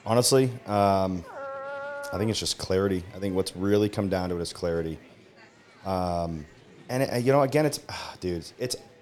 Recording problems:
murmuring crowd; faint; throughout; 25 dB below the speech
dog barking; noticeable; from 1 to 2.5 s; peak 8 dB below the speech

